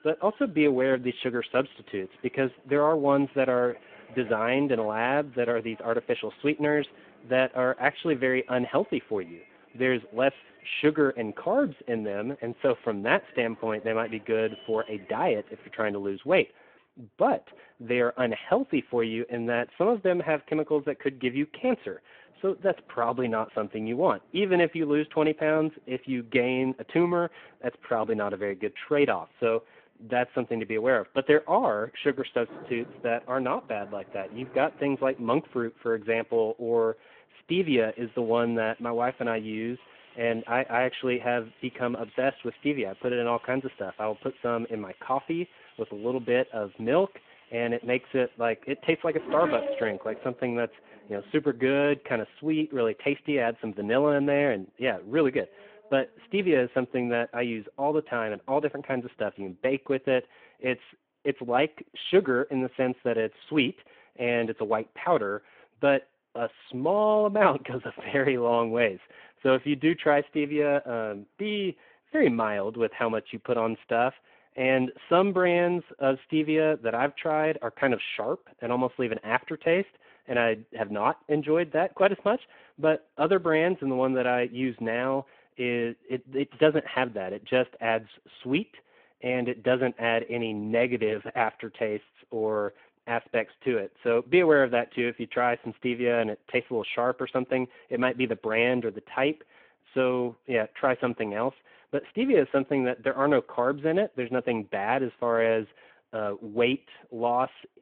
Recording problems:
phone-call audio
traffic noise; faint; until 1:00; 20 dB below the speech

